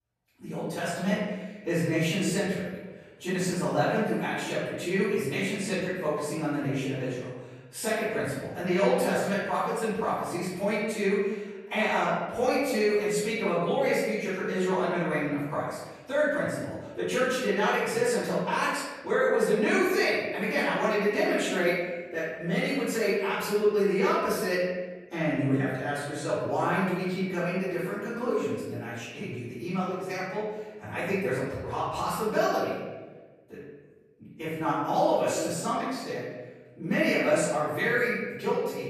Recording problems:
room echo; strong; dies away in 1.2 s
off-mic speech; far

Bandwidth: 15 kHz